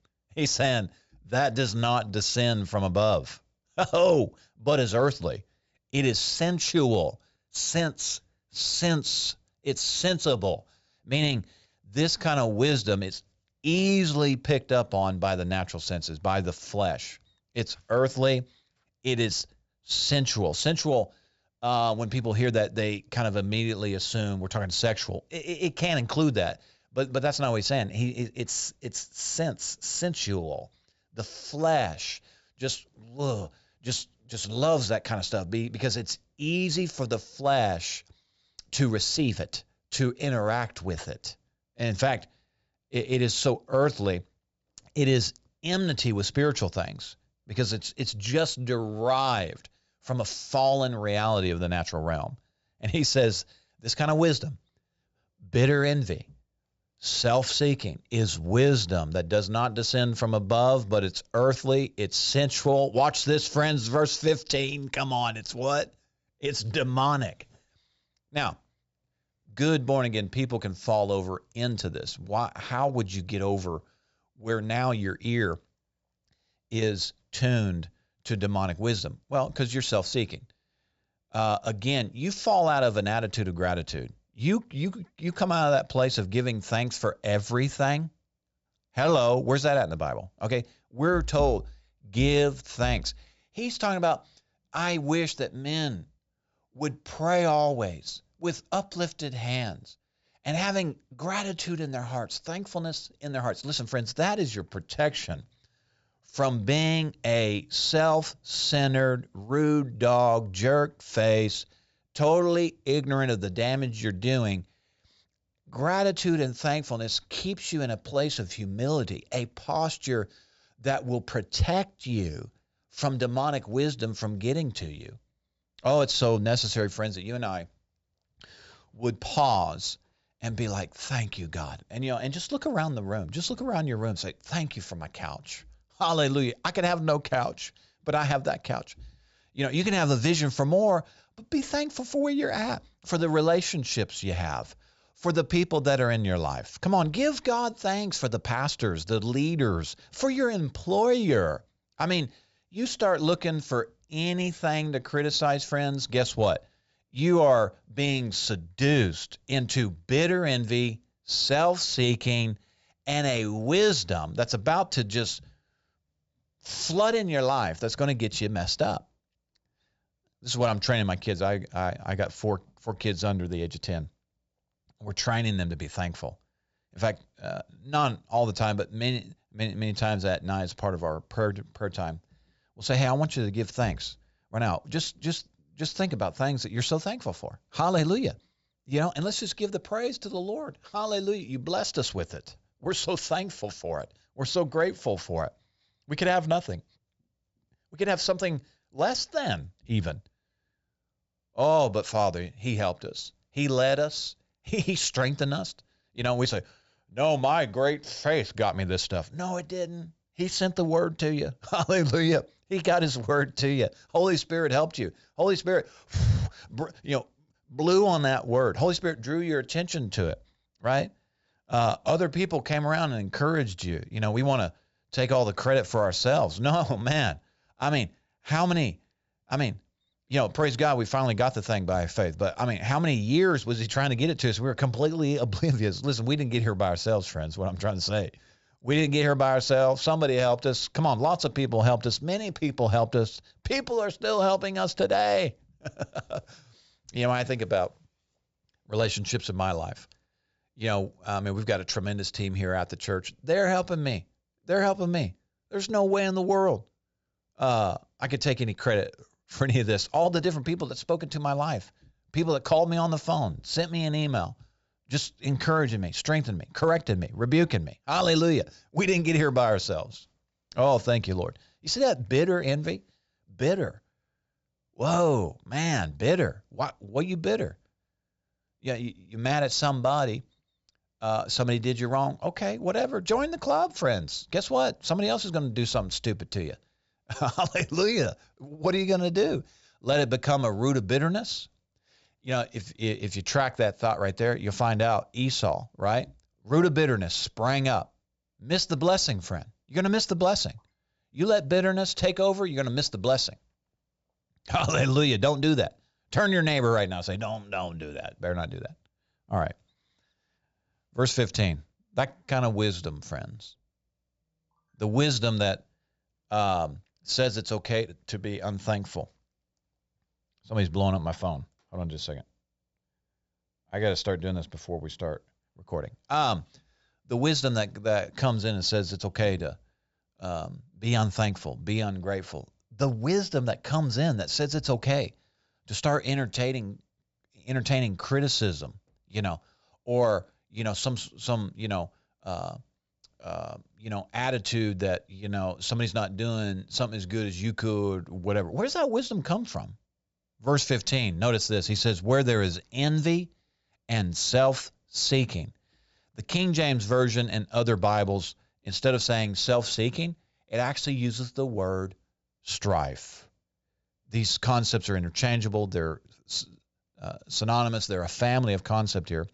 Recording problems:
high frequencies cut off; noticeable; nothing above 8 kHz

